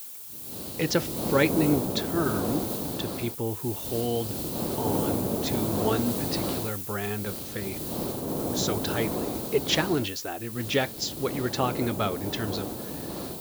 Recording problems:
high frequencies cut off; noticeable; nothing above 8 kHz
hiss; loud; throughout; 1 dB below the speech

